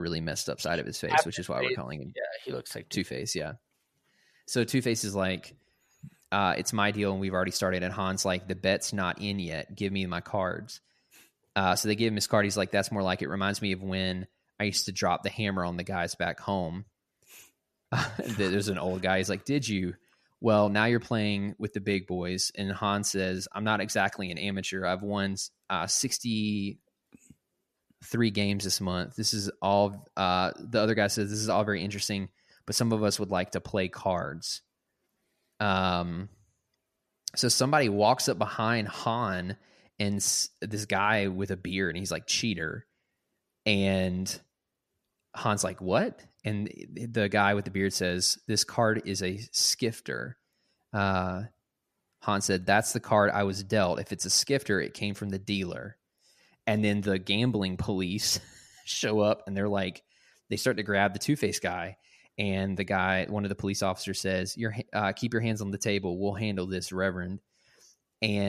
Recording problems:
abrupt cut into speech; at the start and the end

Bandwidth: 14.5 kHz